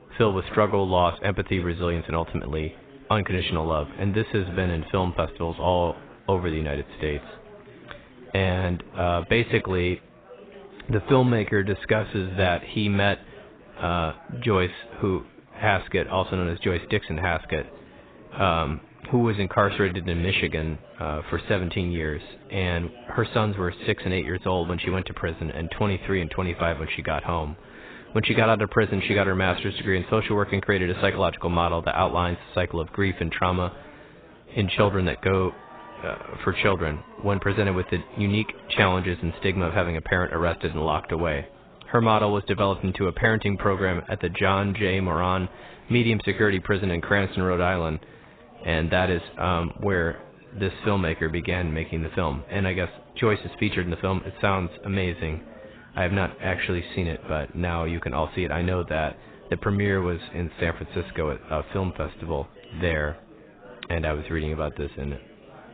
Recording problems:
garbled, watery; badly; nothing above 4 kHz
chatter from many people; faint; throughout; 20 dB below the speech

